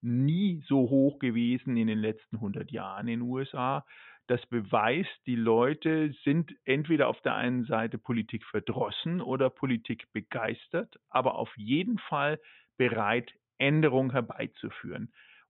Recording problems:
high frequencies cut off; severe; nothing above 3.5 kHz

